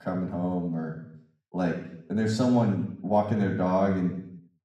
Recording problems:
off-mic speech; far
room echo; noticeable; dies away in 0.7 s

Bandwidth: 14.5 kHz